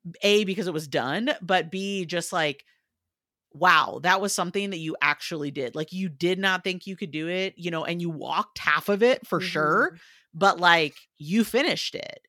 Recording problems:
none

